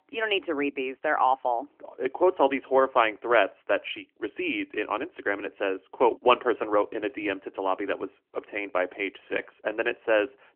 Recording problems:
phone-call audio; nothing above 3 kHz

